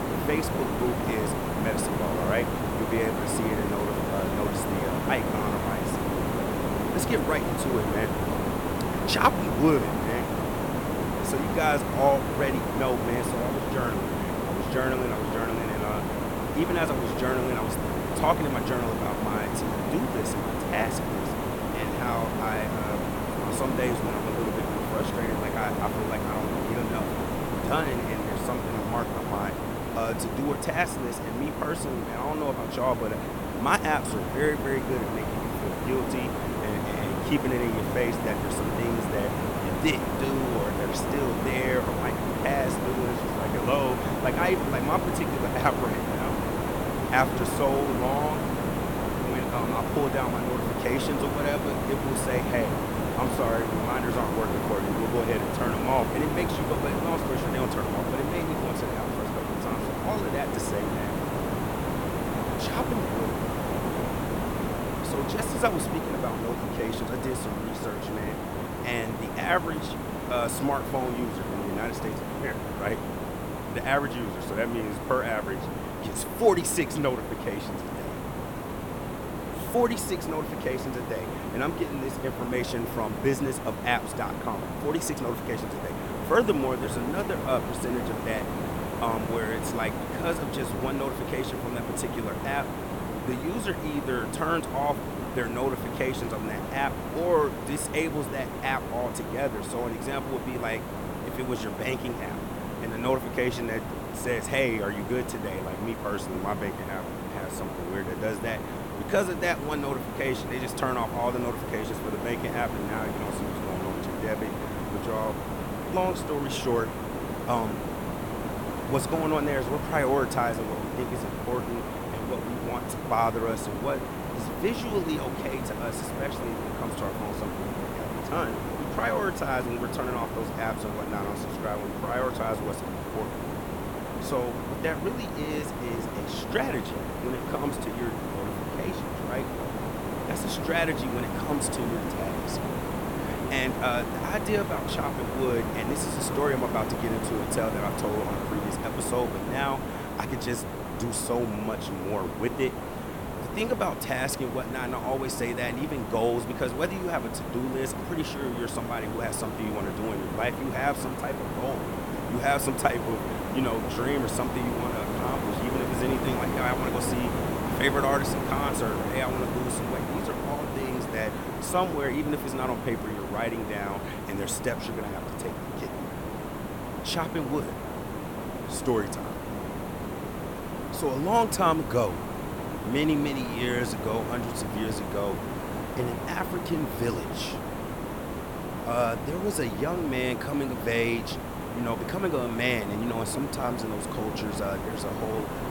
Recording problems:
hiss; loud; throughout; 1 dB below the speech

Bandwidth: 17.5 kHz